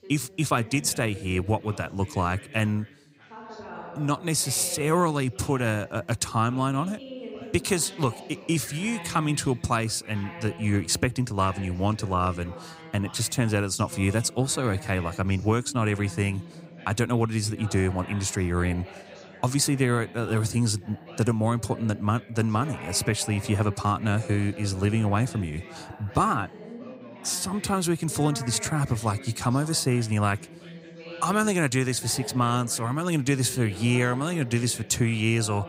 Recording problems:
background chatter; noticeable; throughout; 2 voices, 15 dB below the speech

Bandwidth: 15.5 kHz